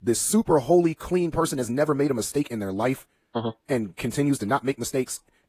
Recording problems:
wrong speed, natural pitch; too fast; 1.6 times normal speed
garbled, watery; slightly; nothing above 15 kHz

